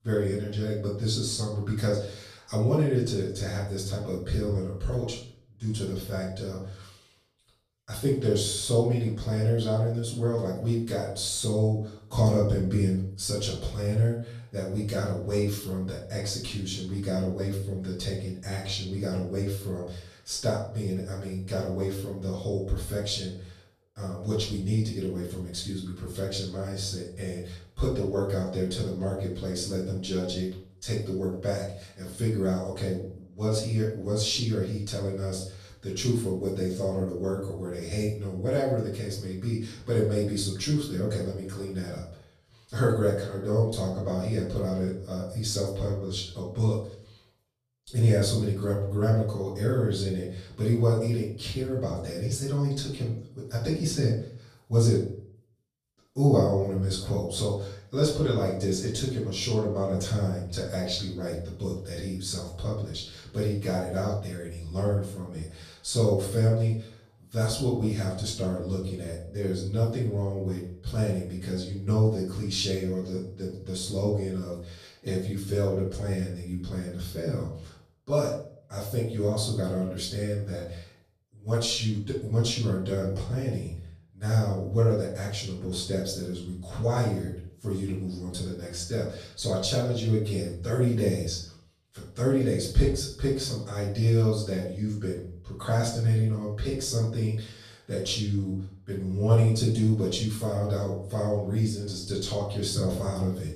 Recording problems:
off-mic speech; far
room echo; noticeable; dies away in 0.5 s

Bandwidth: 15 kHz